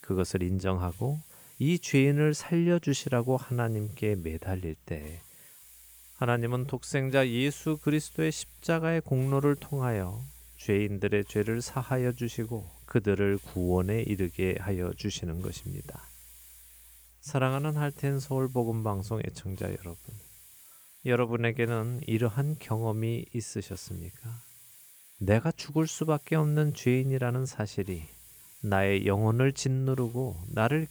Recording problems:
hiss; faint; throughout; 20 dB below the speech

